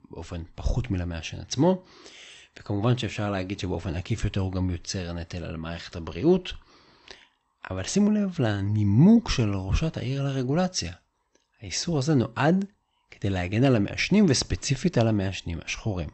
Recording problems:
garbled, watery; slightly; nothing above 8 kHz

